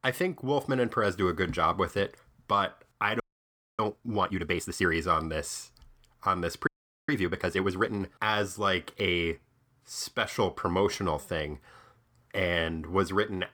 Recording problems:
audio freezing; at 3 s for 0.5 s and at 6.5 s

